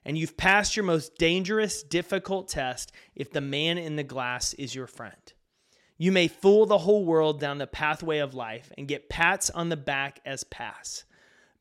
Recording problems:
none

